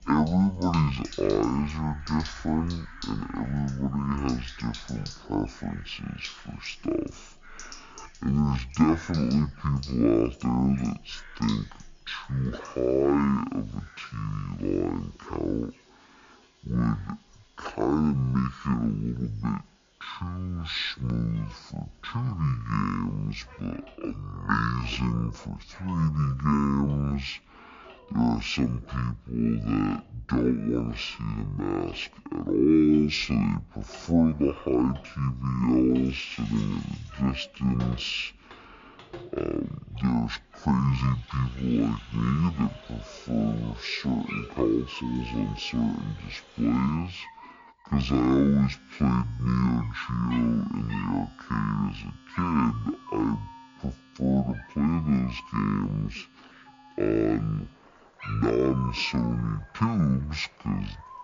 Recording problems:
wrong speed and pitch; too slow and too low; 0.5 times normal speed
animal sounds; faint; throughout; 20 dB below the speech
household noises; faint; throughout; 20 dB below the speech

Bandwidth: 7 kHz